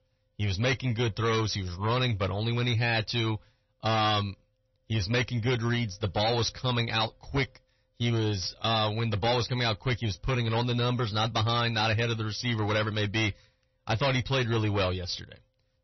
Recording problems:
distortion; heavy; 6 dB below the speech
garbled, watery; slightly; nothing above 6 kHz

